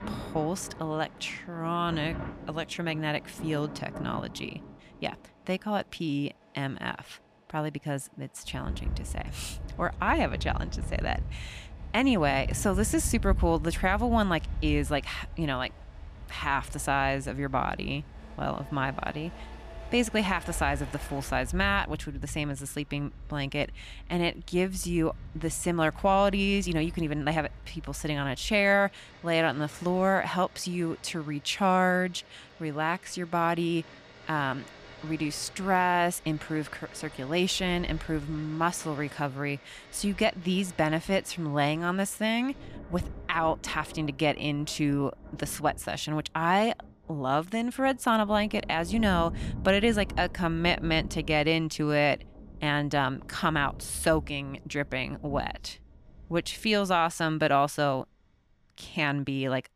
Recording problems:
rain or running water; noticeable; throughout; 15 dB below the speech
traffic noise; faint; throughout; 25 dB below the speech

